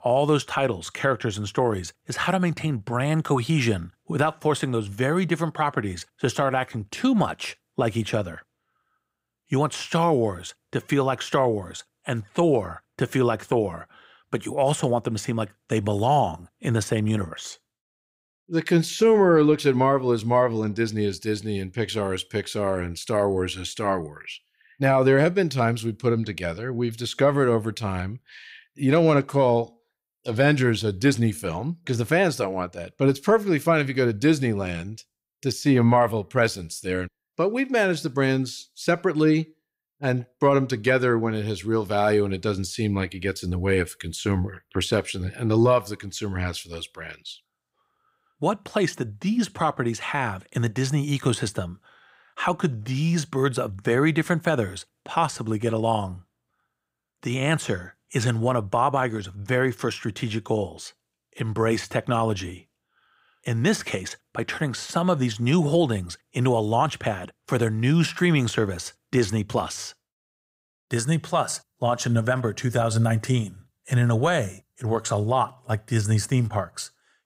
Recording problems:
none

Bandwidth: 15.5 kHz